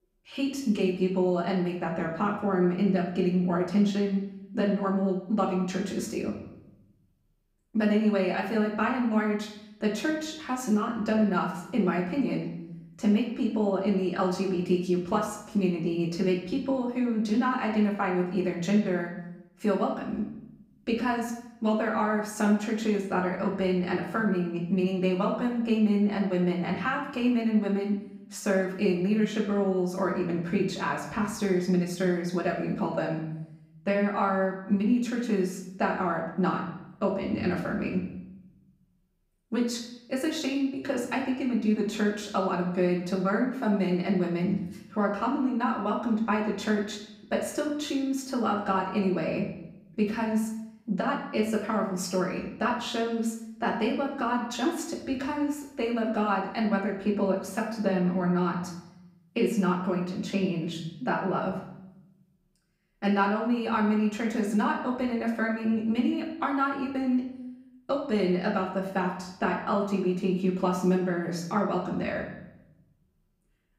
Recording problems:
off-mic speech; far
room echo; noticeable; dies away in 0.8 s

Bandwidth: 15.5 kHz